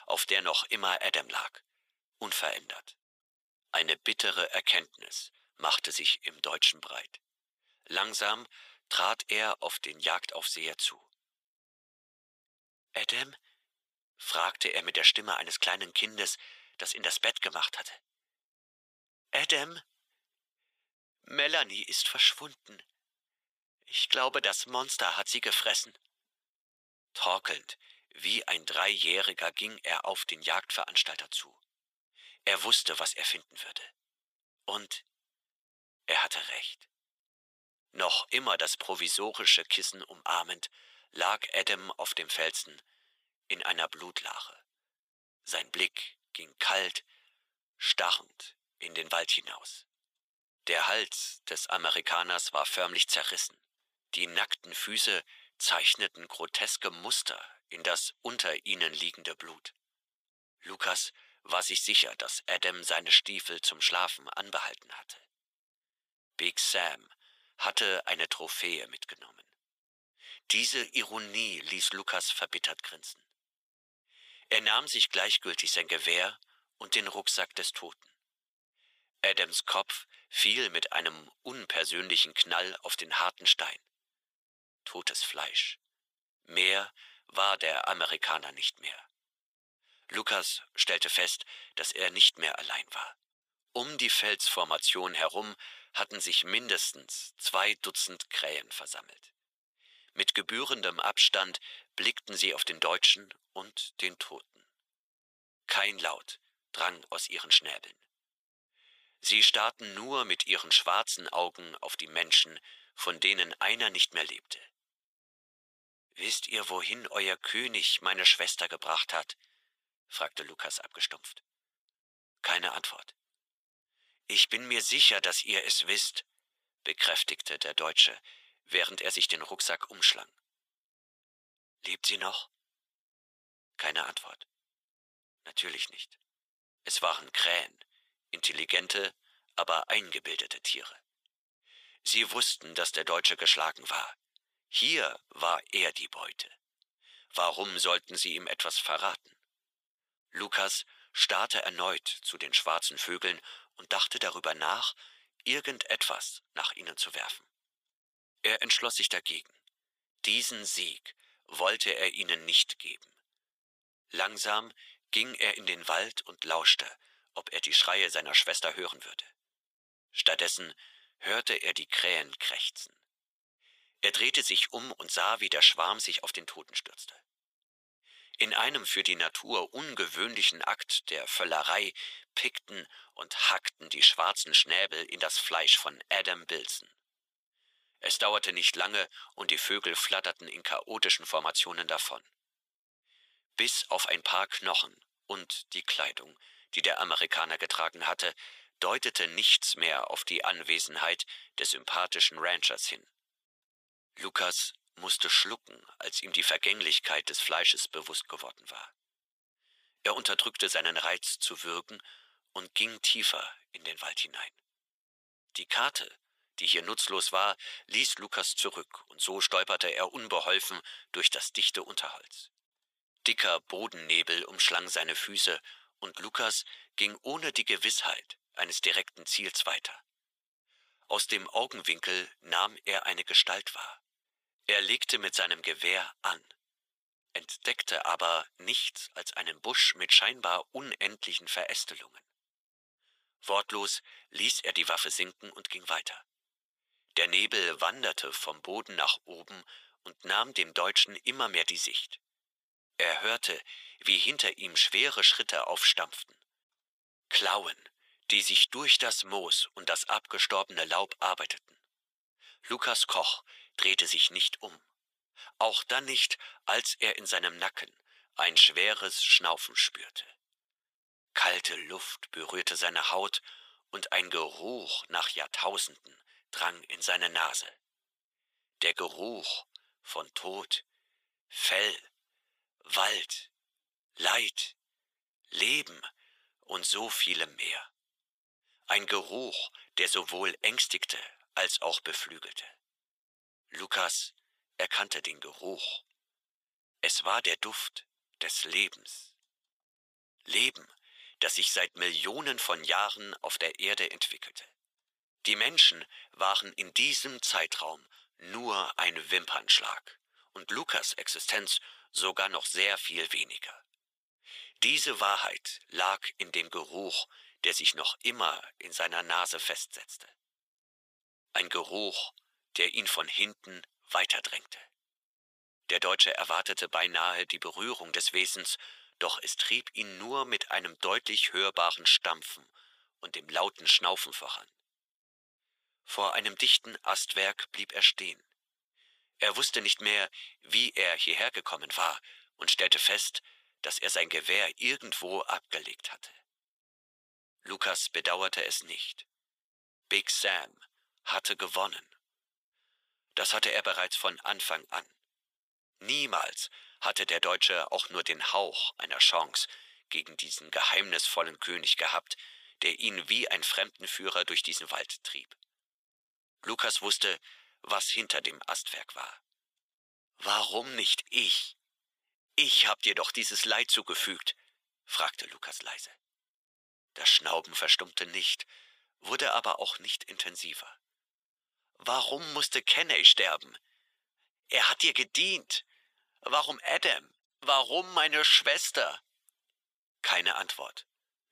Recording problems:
thin; very; fading below 700 Hz

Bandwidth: 15 kHz